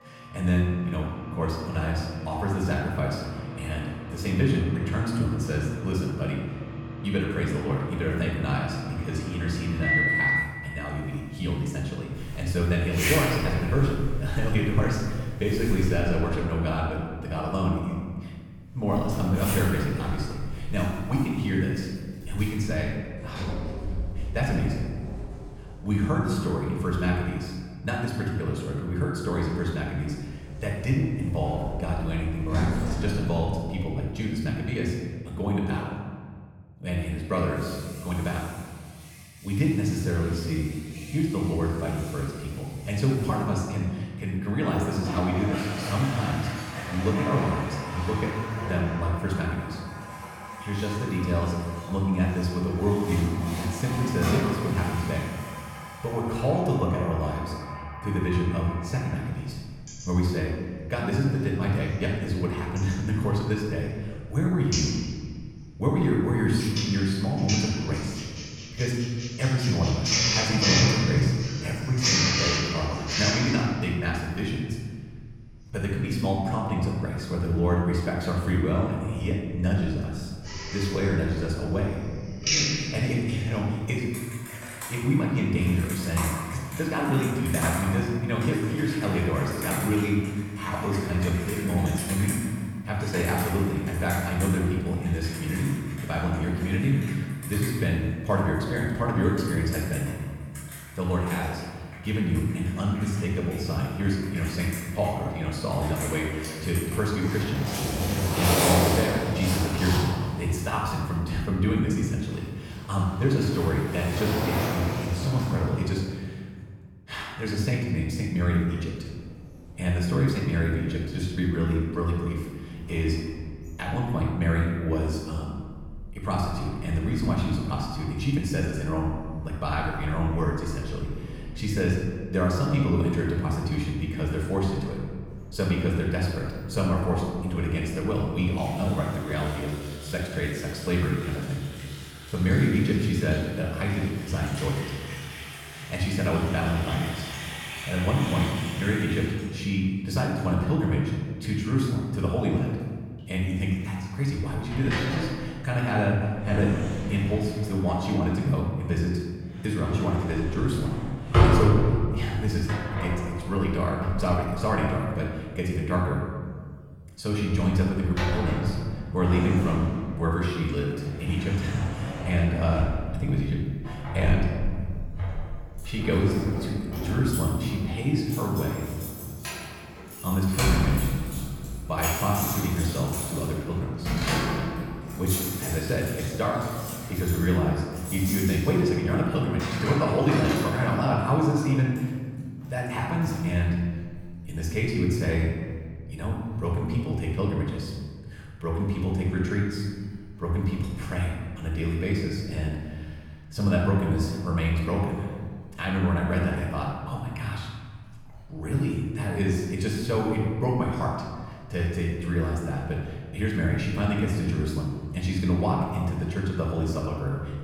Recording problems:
off-mic speech; far
room echo; noticeable; dies away in 1.5 s
household noises; loud; throughout; 5 dB below the speech

